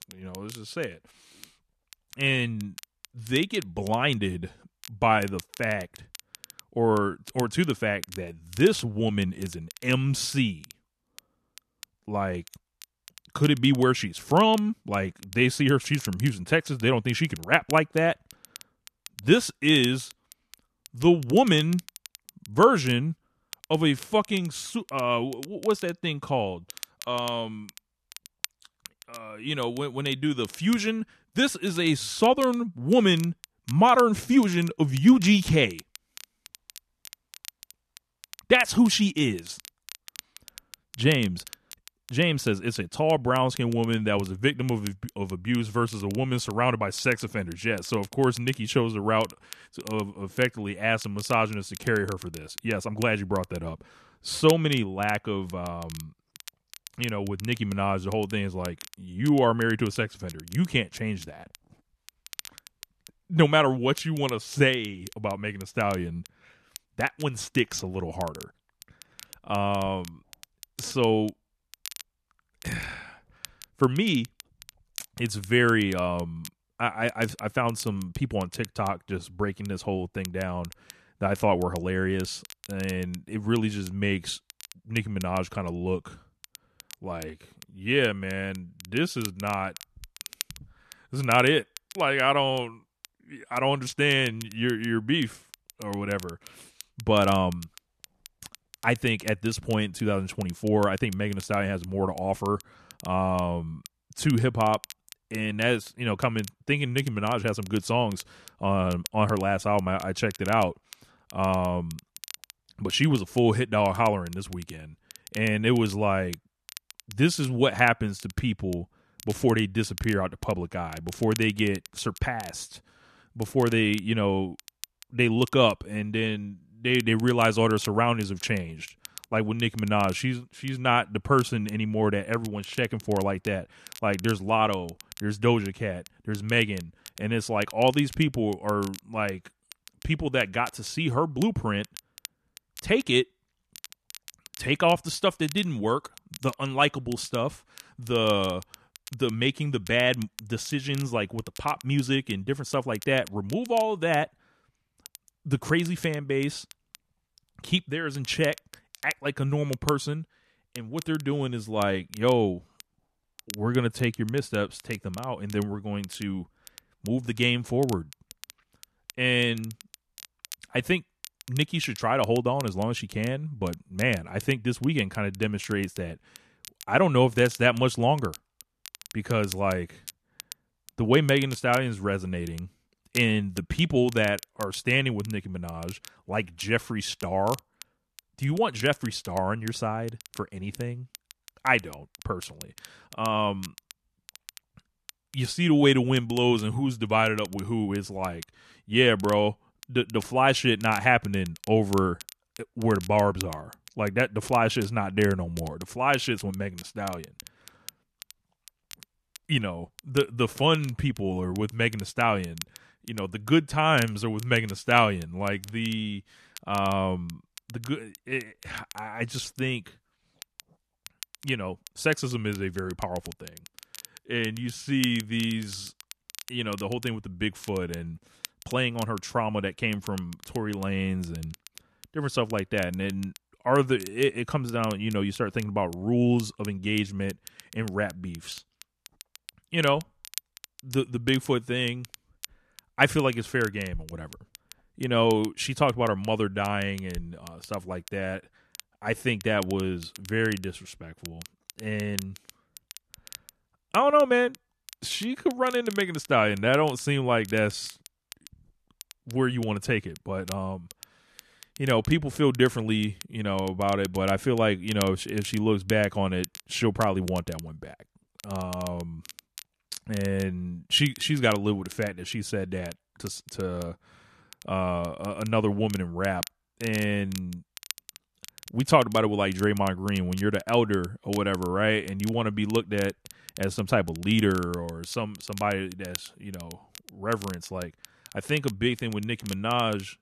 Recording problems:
crackle, like an old record; noticeable; 20 dB below the speech

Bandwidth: 14 kHz